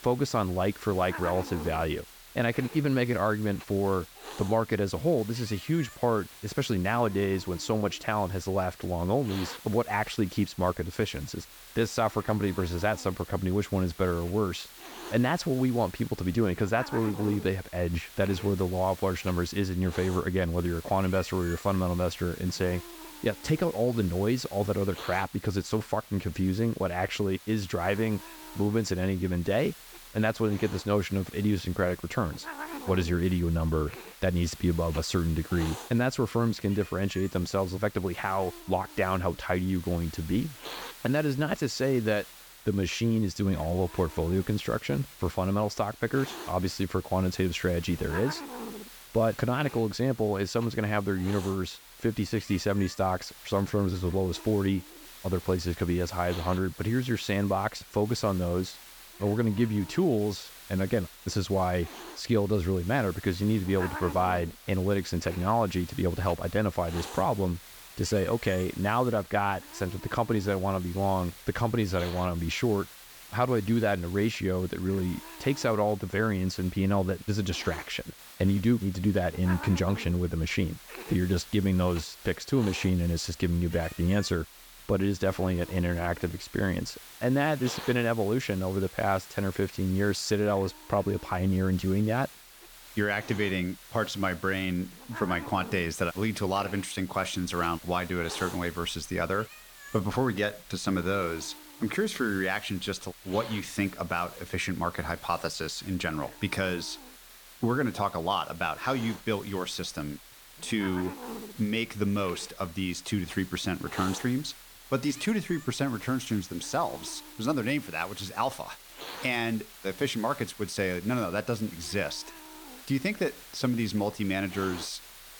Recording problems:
hiss; noticeable; throughout; 15 dB below the speech

